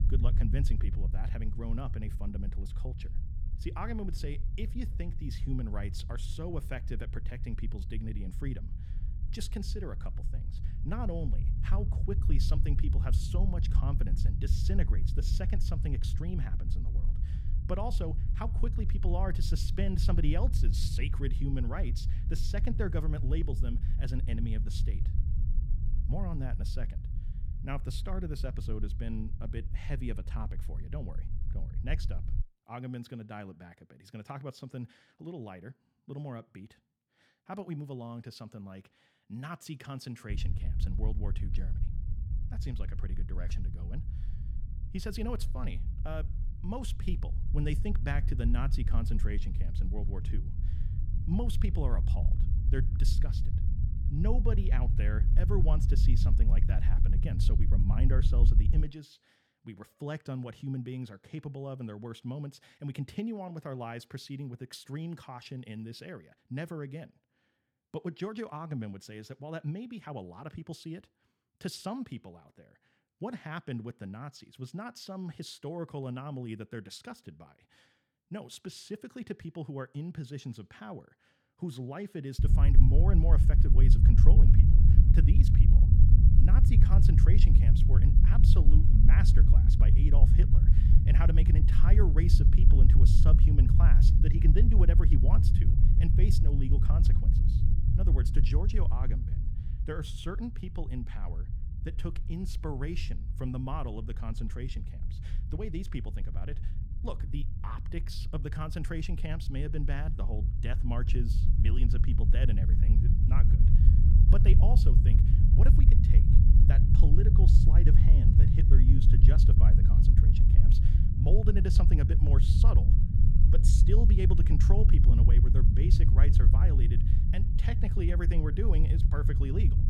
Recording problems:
low rumble; loud; until 32 s, from 40 to 59 s and from 1:22 on; 1 dB below the speech

